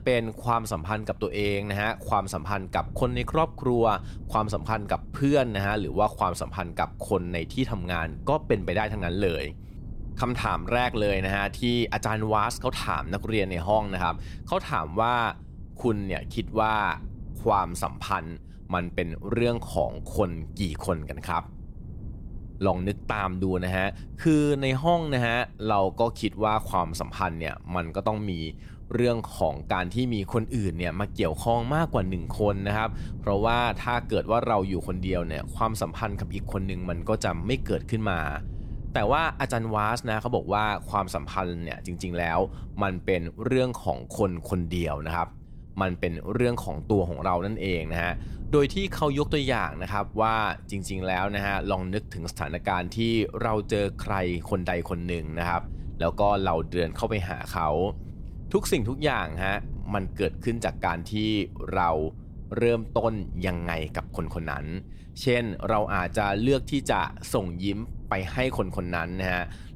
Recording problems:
wind noise on the microphone; occasional gusts; 25 dB below the speech

